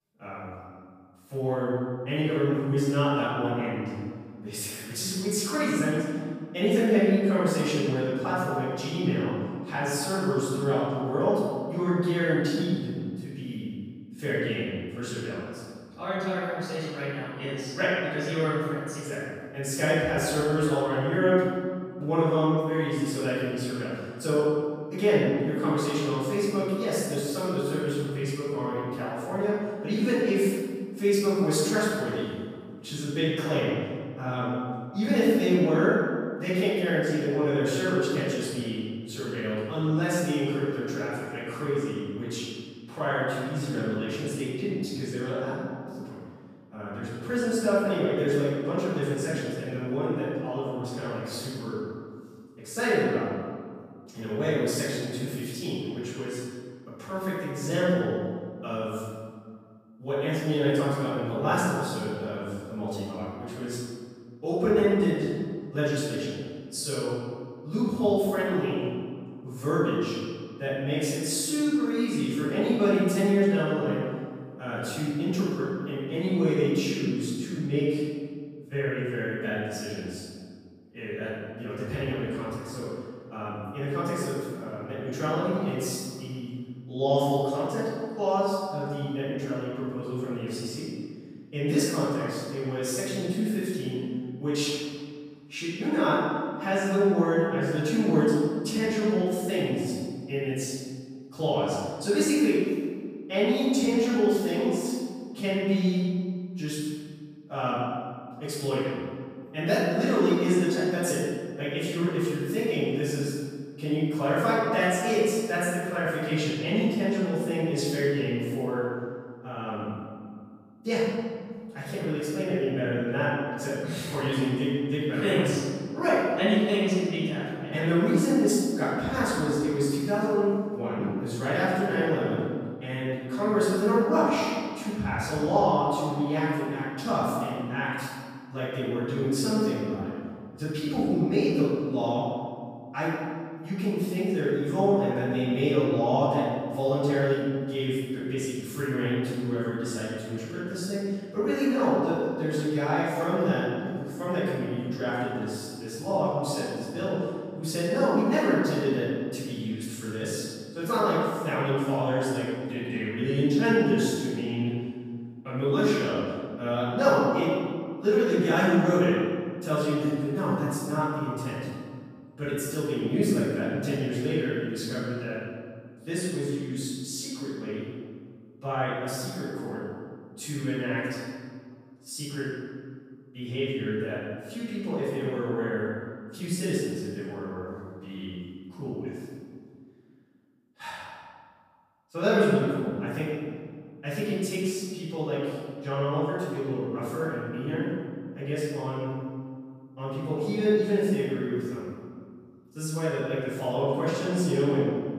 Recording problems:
room echo; strong; dies away in 1.8 s
off-mic speech; far

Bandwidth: 15 kHz